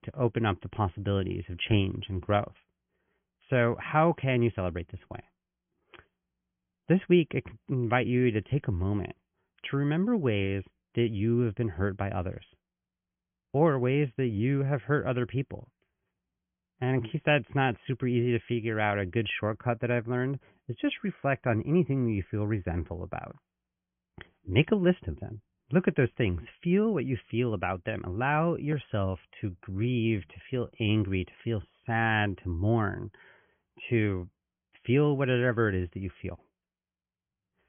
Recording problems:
high frequencies cut off; severe; nothing above 3.5 kHz

